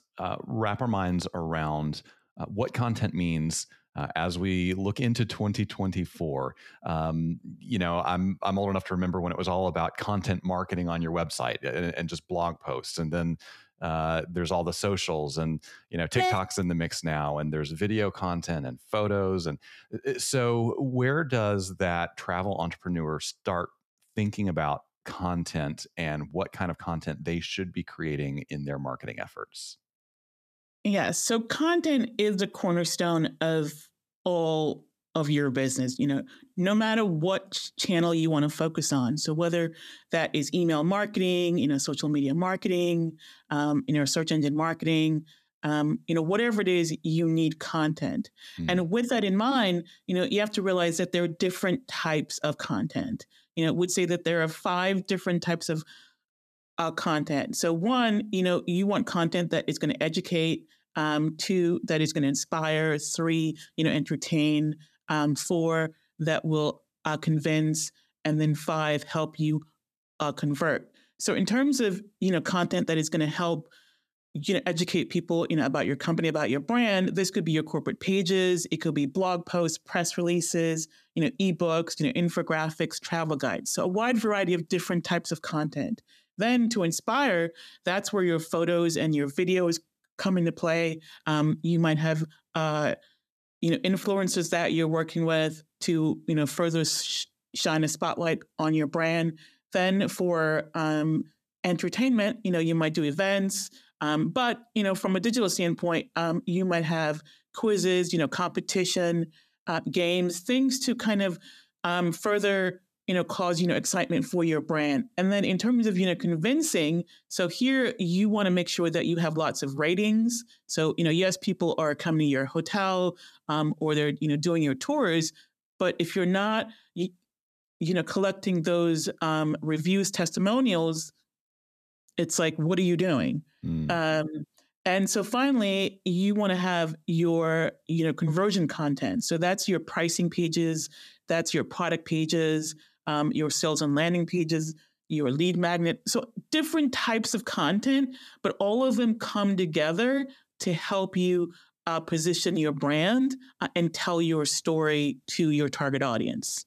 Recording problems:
none

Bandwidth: 14.5 kHz